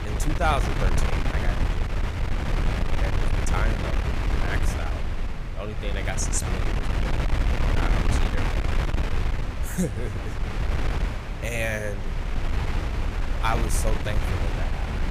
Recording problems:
wind noise on the microphone; heavy; 1 dB below the speech

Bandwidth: 15 kHz